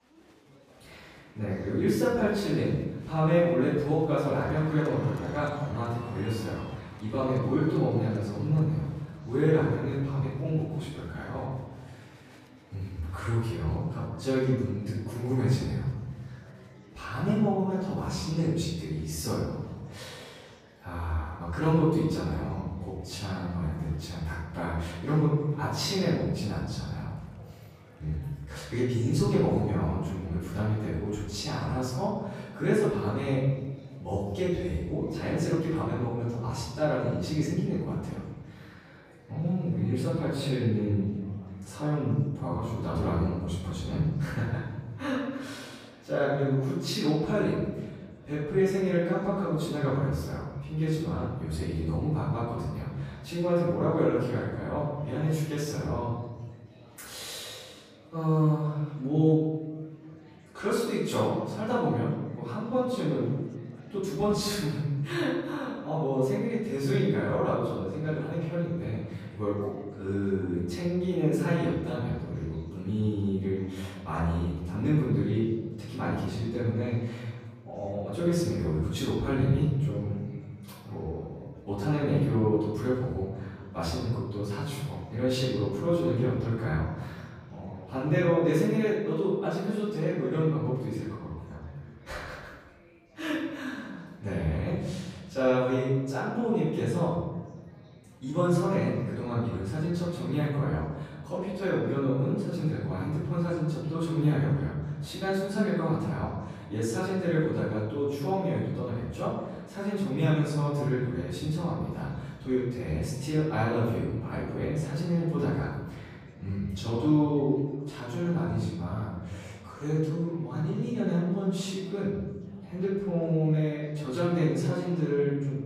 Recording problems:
room echo; strong; dies away in 1.2 s
off-mic speech; far
chatter from many people; faint; throughout; 25 dB below the speech

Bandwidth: 14.5 kHz